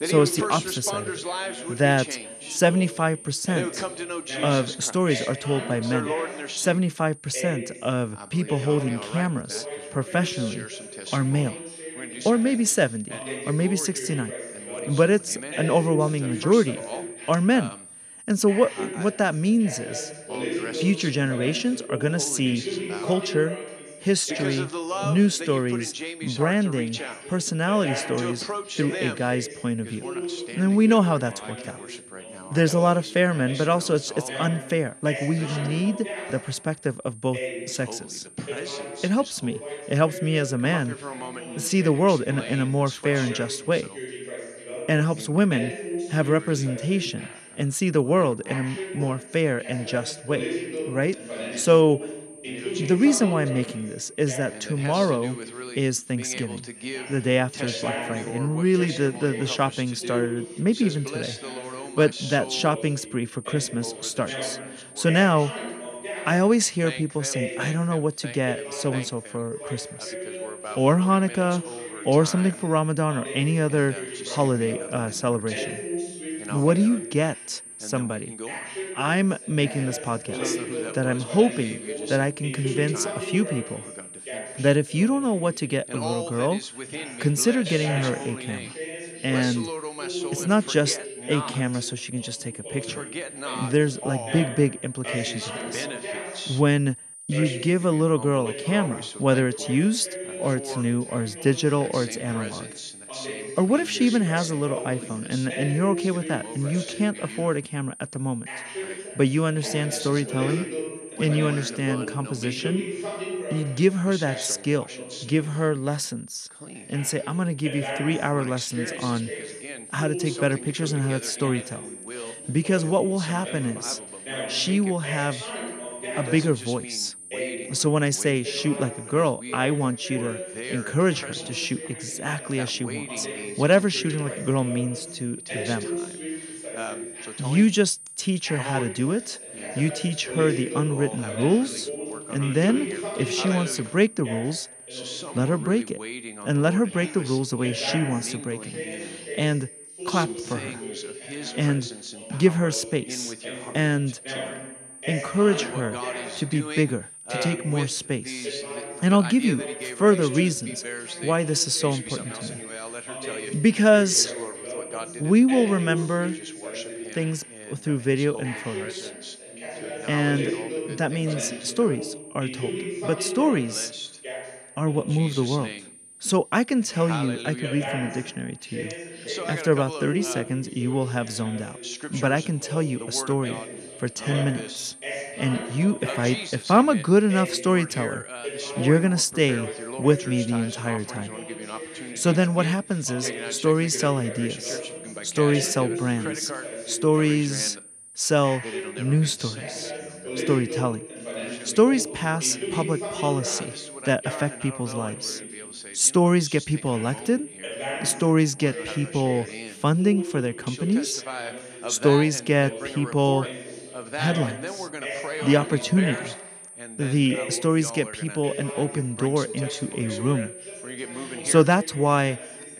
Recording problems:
background chatter; loud; throughout; 2 voices, 10 dB below the speech
high-pitched whine; noticeable; throughout; 9 kHz, 15 dB below the speech

